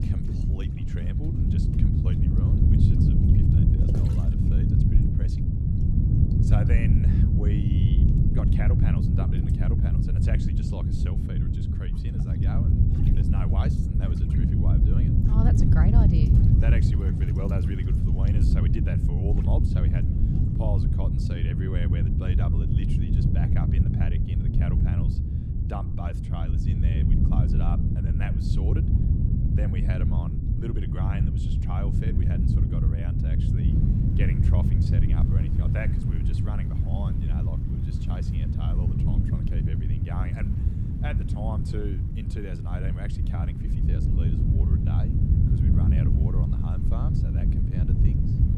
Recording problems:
wind noise on the microphone; heavy; 5 dB above the speech
rain or running water; noticeable; throughout; 10 dB below the speech

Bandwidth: 15 kHz